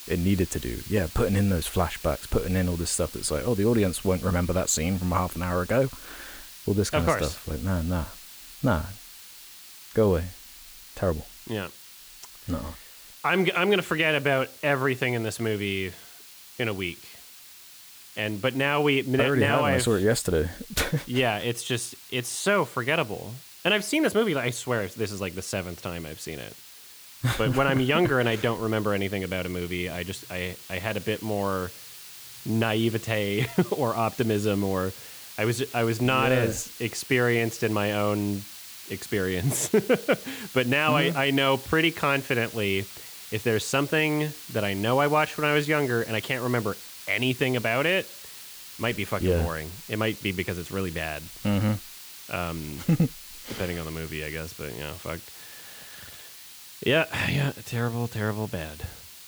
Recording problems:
hiss; noticeable; throughout; 15 dB below the speech

